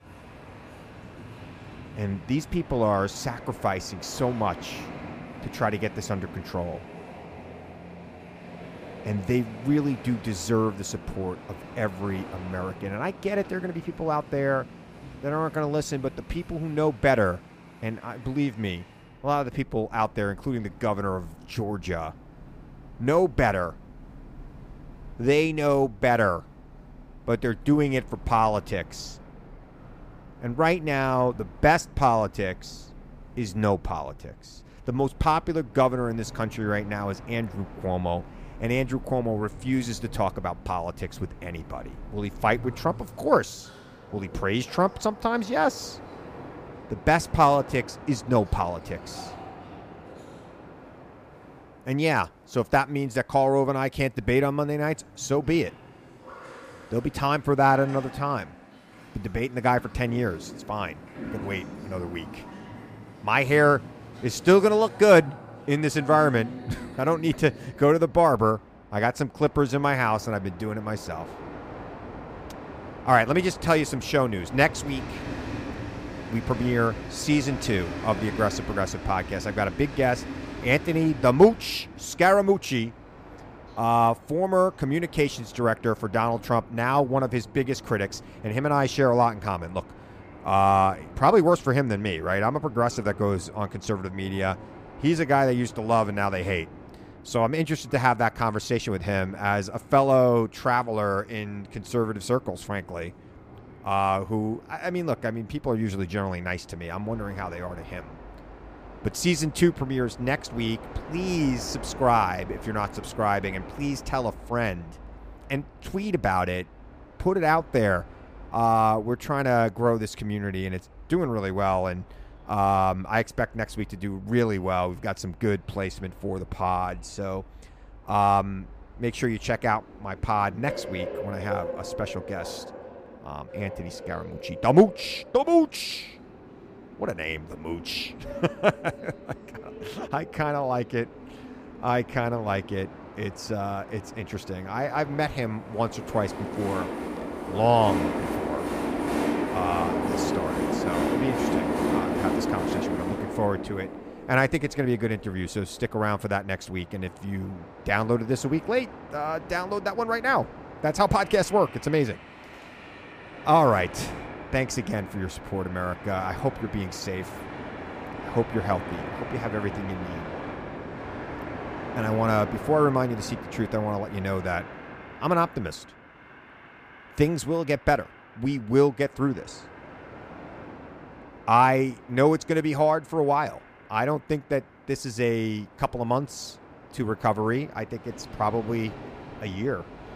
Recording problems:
train or aircraft noise; noticeable; throughout; 15 dB below the speech

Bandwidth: 15 kHz